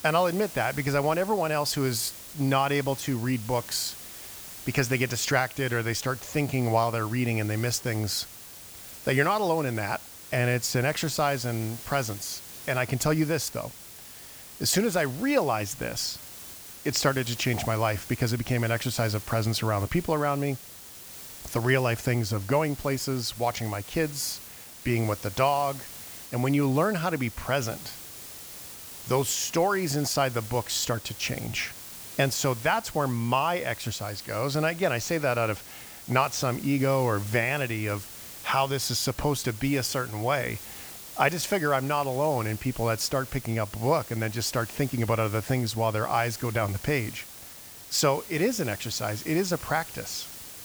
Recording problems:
hiss; noticeable; throughout; 15 dB below the speech

